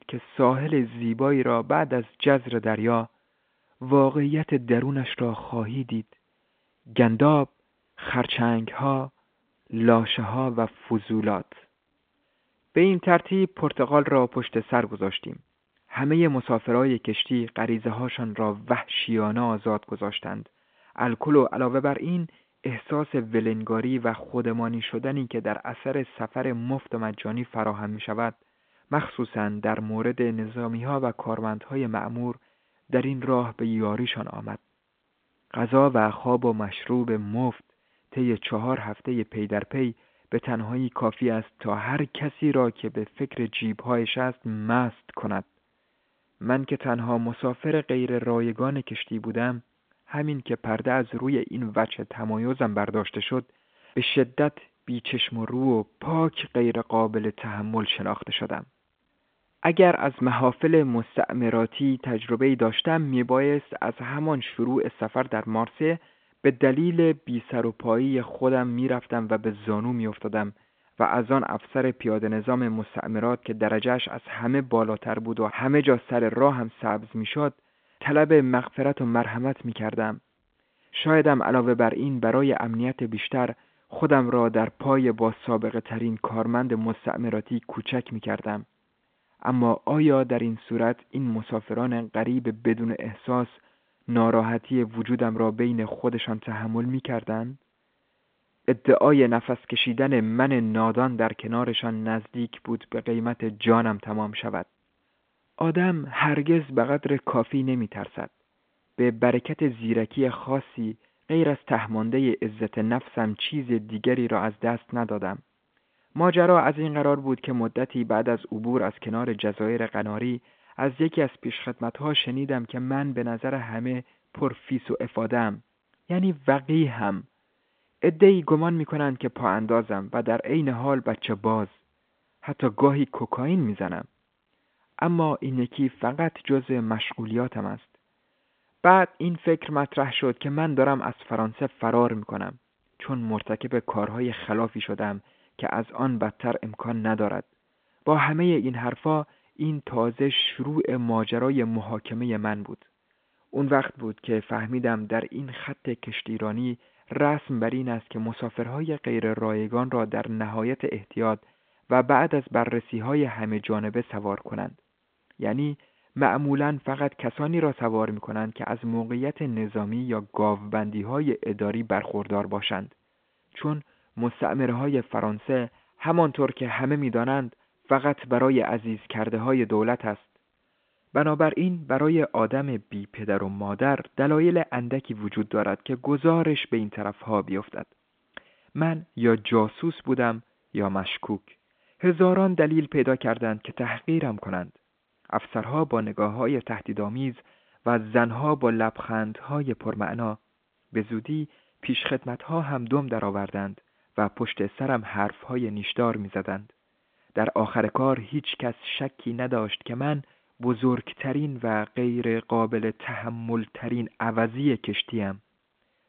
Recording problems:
phone-call audio; nothing above 3.5 kHz

